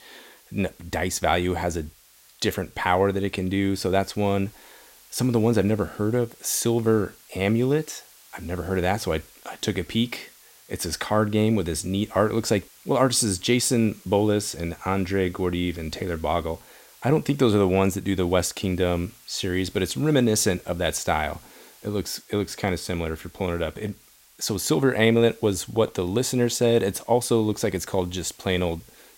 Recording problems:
hiss; faint; throughout; 25 dB below the speech

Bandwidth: 16 kHz